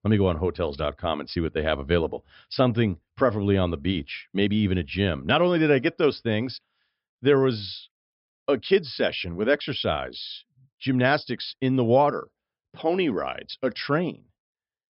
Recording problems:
high frequencies cut off; noticeable; nothing above 5.5 kHz

